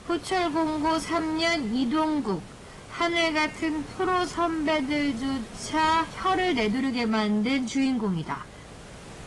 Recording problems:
wrong speed, natural pitch; too slow; 0.6 times normal speed
distortion; slight; 10 dB below the speech
garbled, watery; slightly; nothing above 10.5 kHz
hiss; noticeable; throughout; 15 dB below the speech
uneven, jittery; strongly; from 5 to 8.5 s

